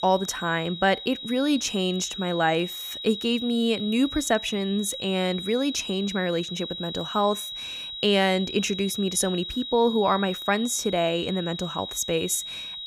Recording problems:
high-pitched whine; loud; throughout; 4 kHz, 8 dB below the speech

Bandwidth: 15 kHz